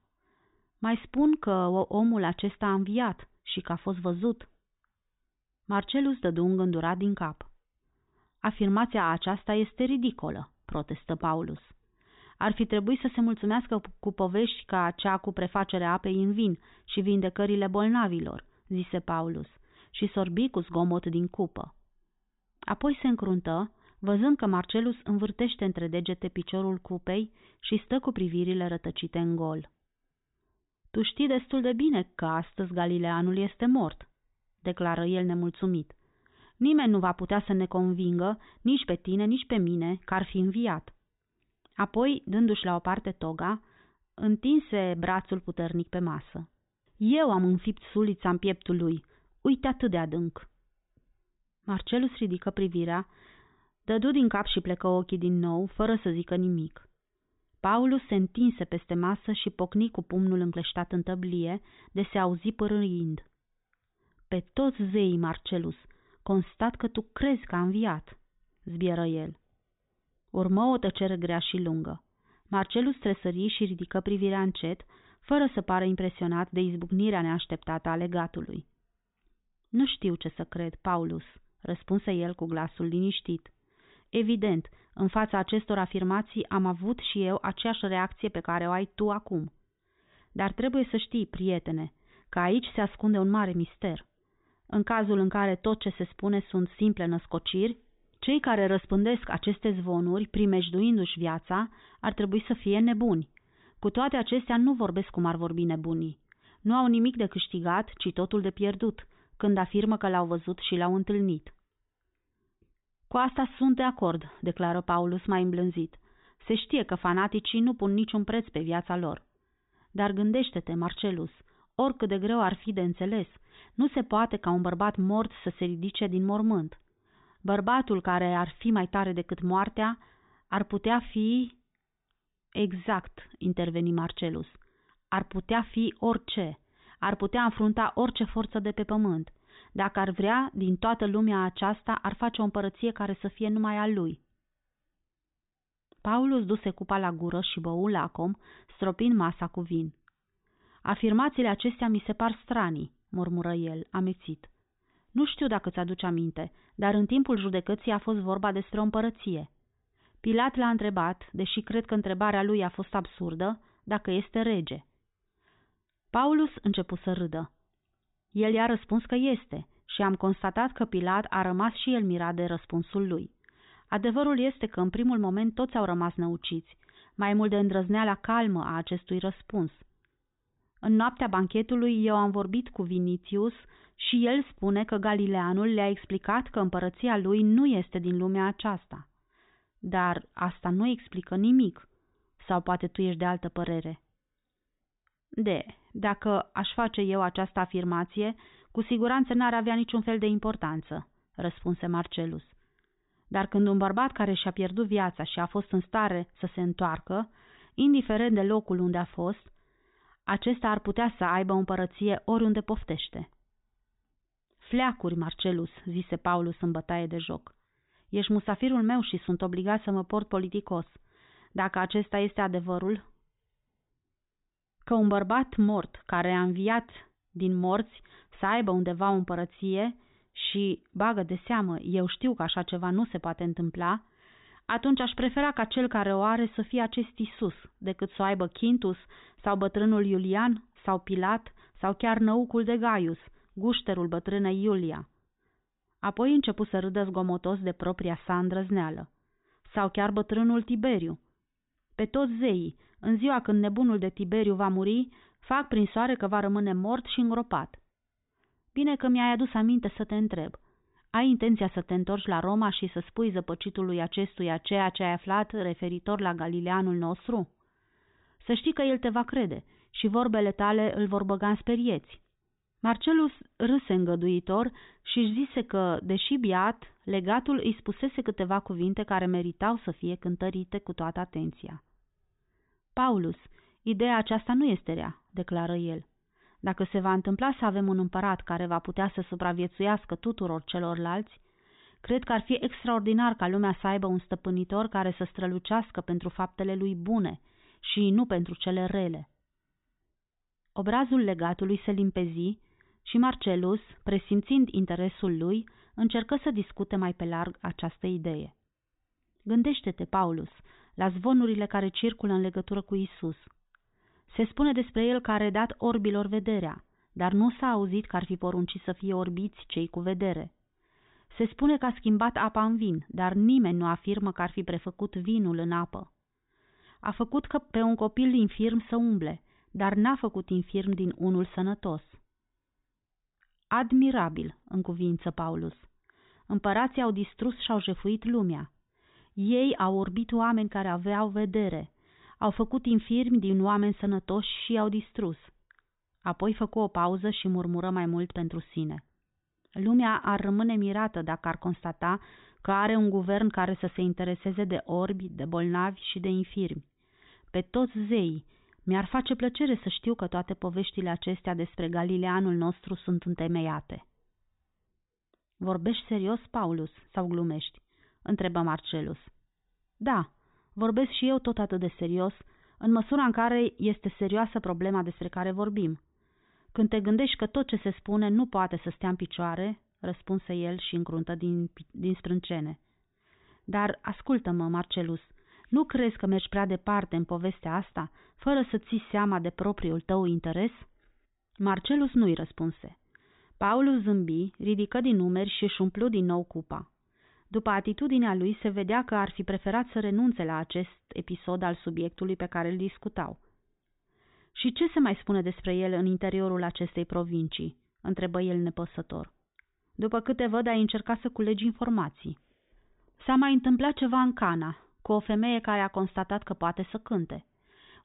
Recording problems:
high frequencies cut off; severe; nothing above 4 kHz

